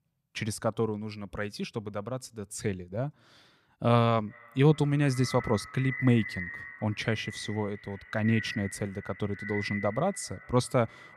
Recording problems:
echo of what is said; strong; from 4 s on; 380 ms later, 10 dB below the speech

